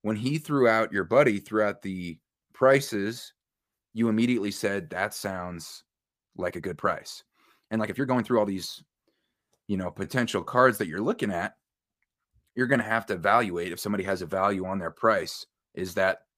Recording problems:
uneven, jittery; strongly; from 2.5 to 13 s

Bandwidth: 15 kHz